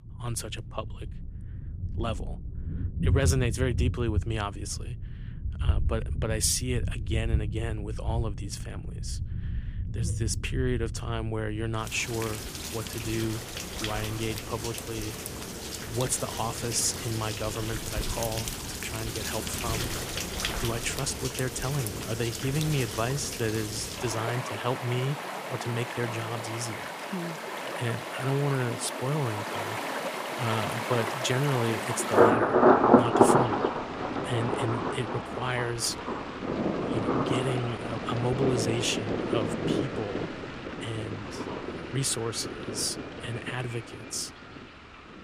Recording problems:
rain or running water; very loud; throughout; 1 dB above the speech

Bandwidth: 15 kHz